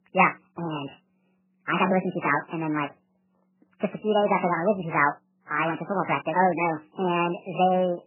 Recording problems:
garbled, watery; badly; nothing above 3 kHz
wrong speed and pitch; too fast and too high; 1.6 times normal speed

